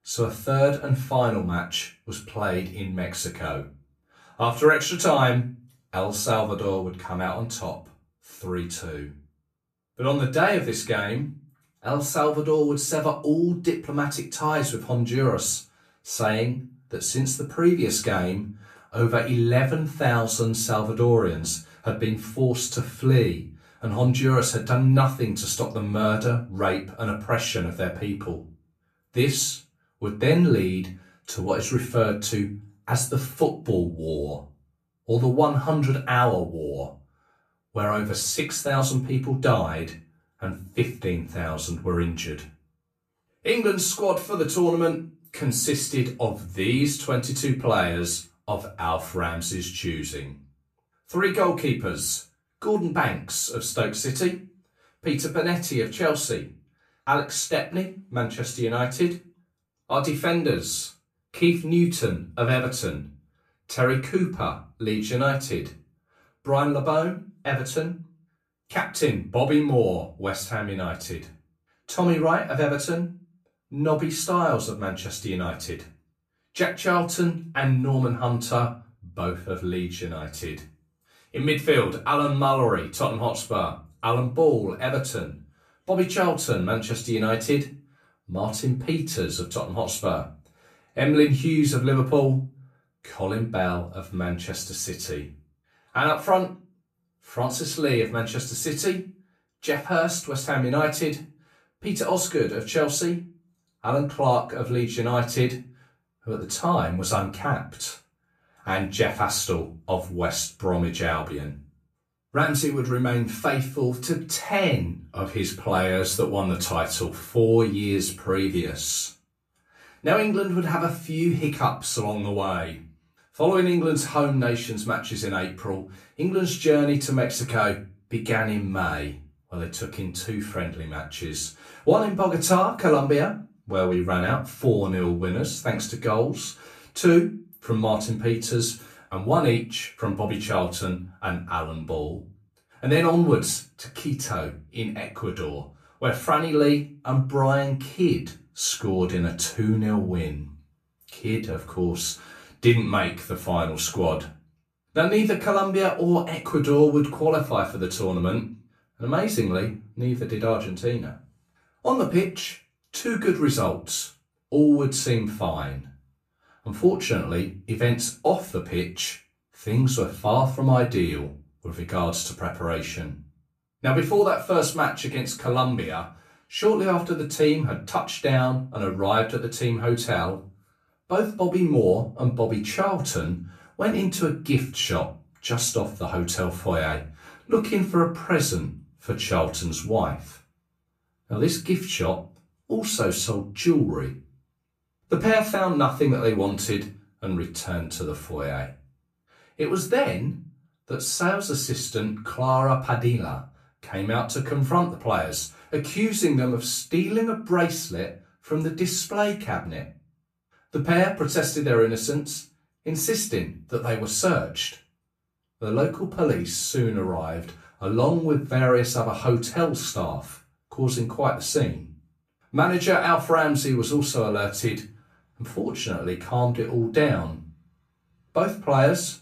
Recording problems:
off-mic speech; far
room echo; very slight; dies away in 0.3 s

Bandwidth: 14.5 kHz